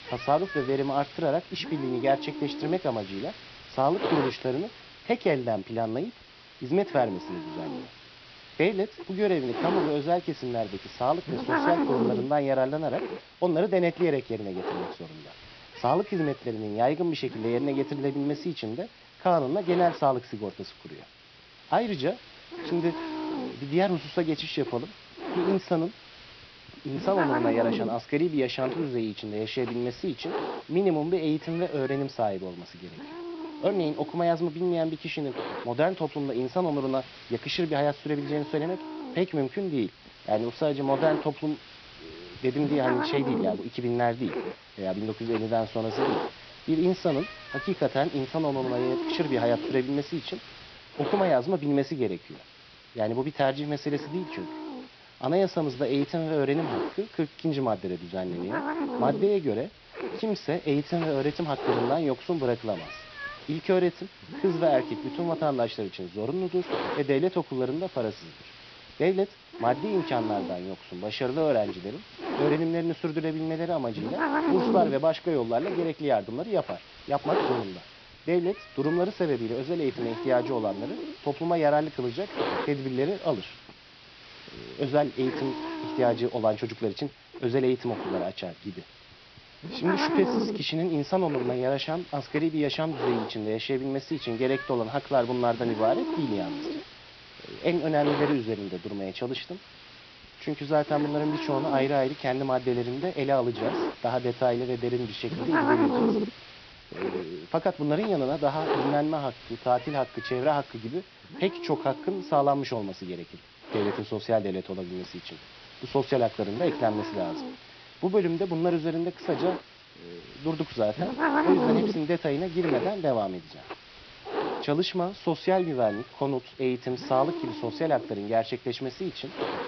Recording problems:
high frequencies cut off; noticeable; nothing above 5.5 kHz
hiss; loud; throughout; 6 dB below the speech

